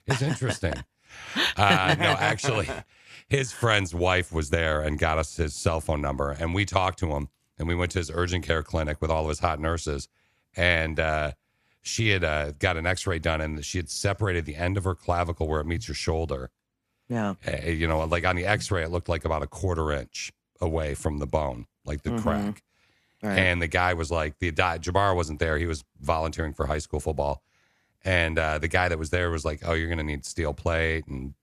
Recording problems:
none

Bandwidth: 14.5 kHz